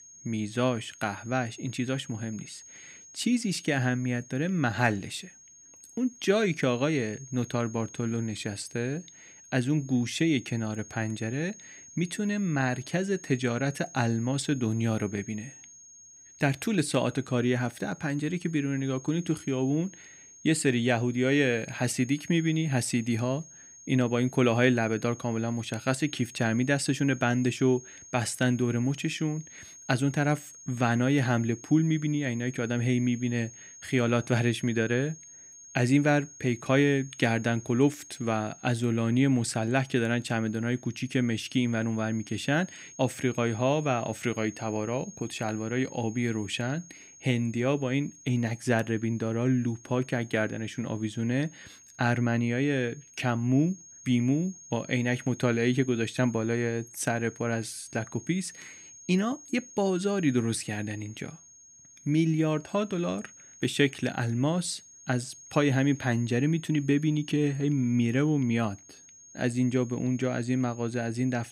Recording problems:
high-pitched whine; noticeable; throughout; 6.5 kHz, 20 dB below the speech

